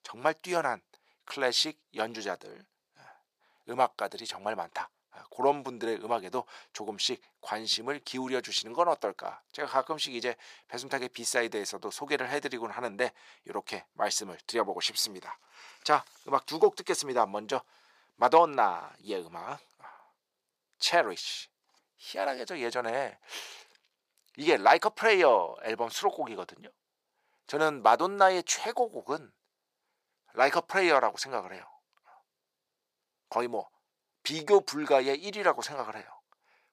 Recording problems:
thin; very; fading below 550 Hz

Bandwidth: 15 kHz